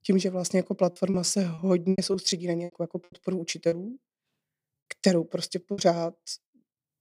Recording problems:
choppy; very; 10% of the speech affected

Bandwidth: 15.5 kHz